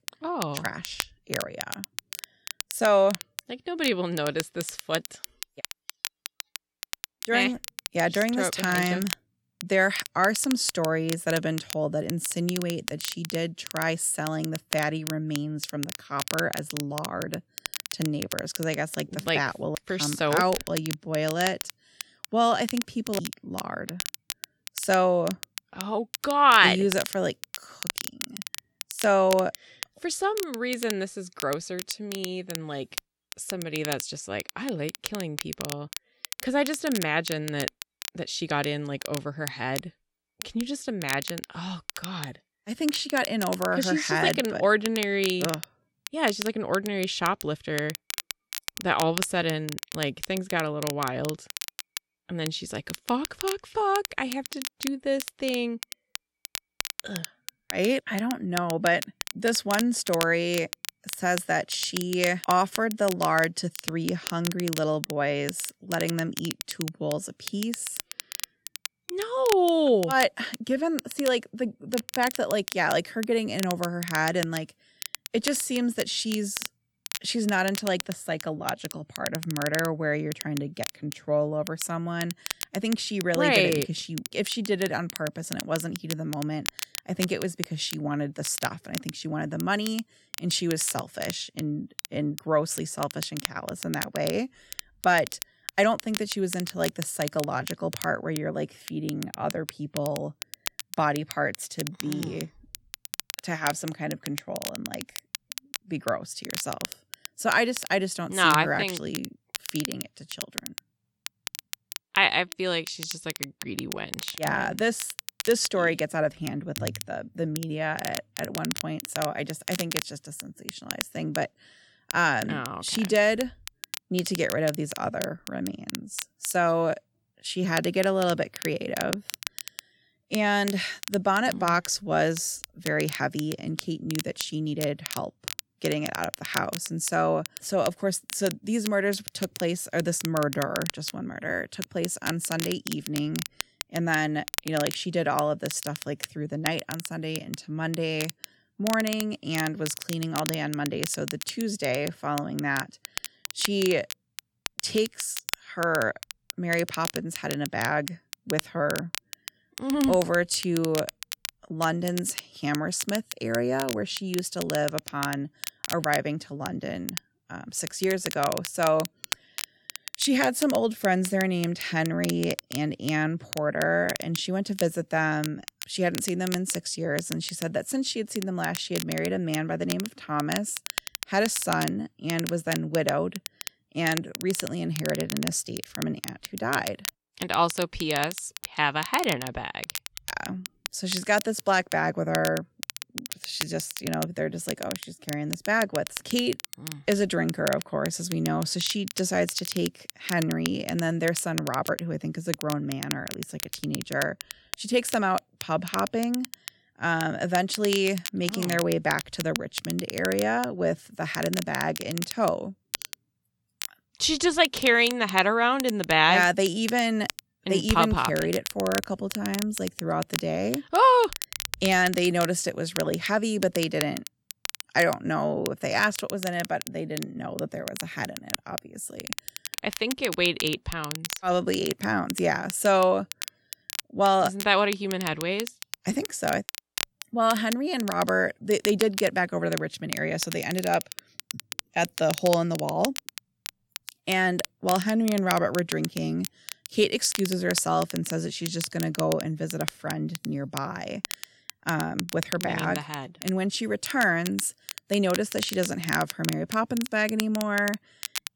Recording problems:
crackle, like an old record; loud; 9 dB below the speech

